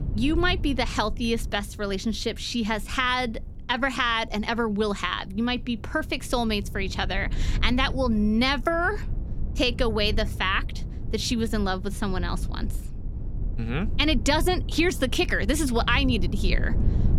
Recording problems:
low rumble; faint; throughout; 20 dB below the speech

